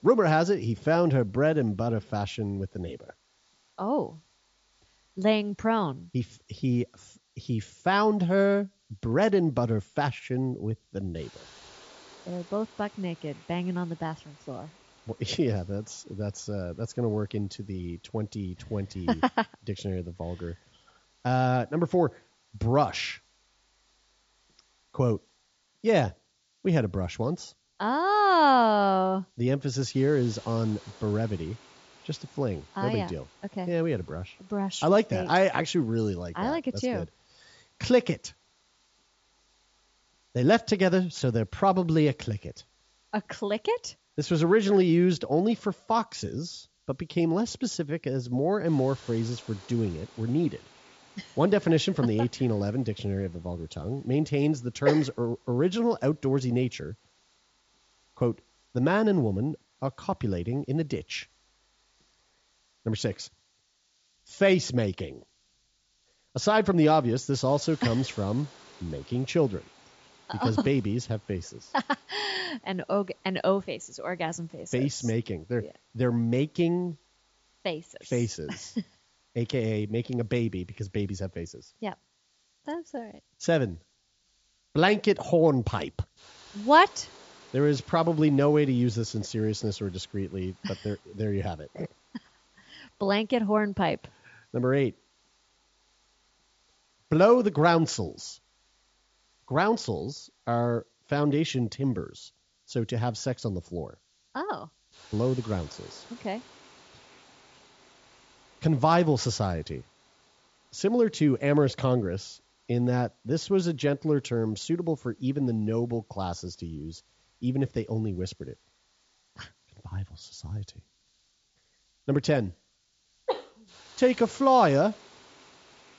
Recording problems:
high frequencies cut off; noticeable; nothing above 7.5 kHz
hiss; faint; throughout; 30 dB below the speech

